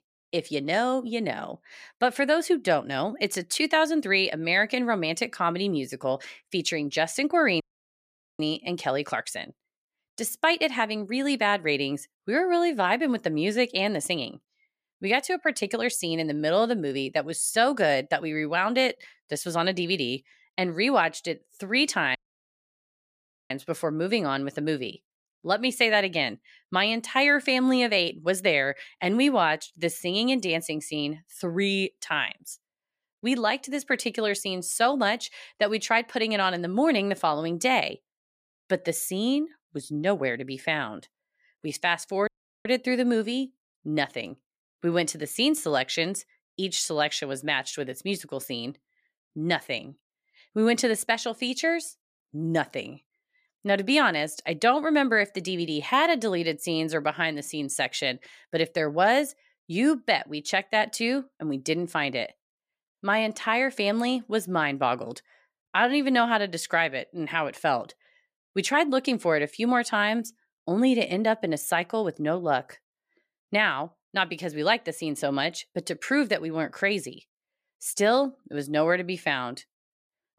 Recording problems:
audio cutting out; at 7.5 s for 1 s, at 22 s for 1.5 s and at 42 s

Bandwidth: 14.5 kHz